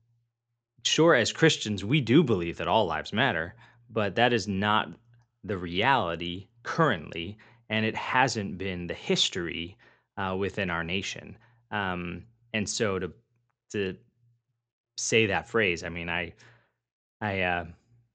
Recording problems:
high frequencies cut off; noticeable; nothing above 8 kHz

